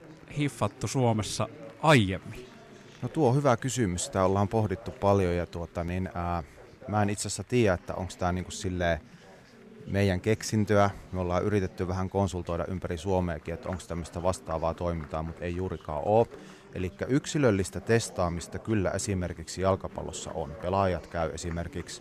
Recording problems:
chatter from many people; noticeable; throughout; 20 dB below the speech

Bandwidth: 14.5 kHz